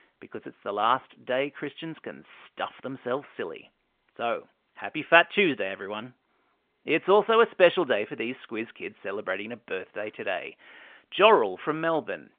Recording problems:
phone-call audio; nothing above 3 kHz

